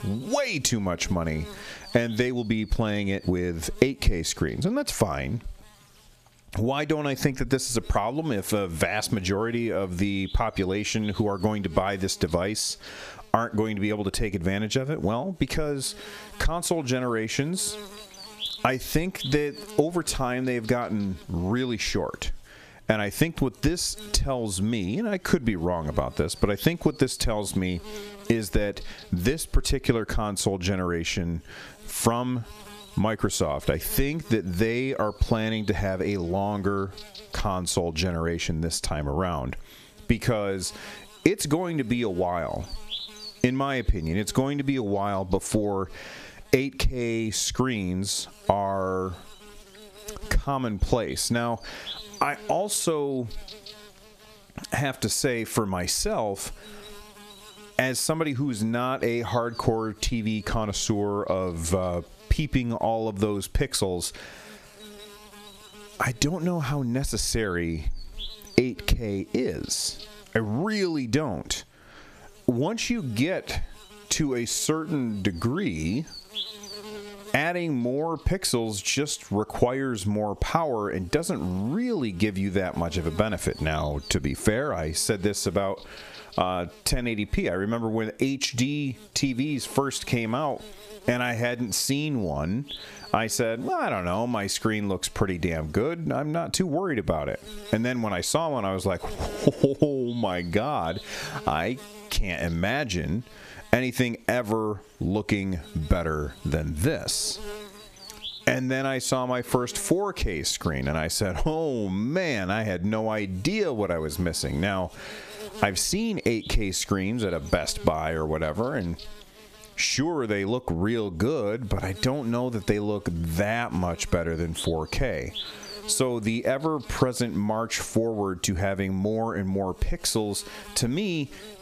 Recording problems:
squashed, flat; heavily
electrical hum; noticeable; throughout; 60 Hz, 15 dB below the speech

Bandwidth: 14.5 kHz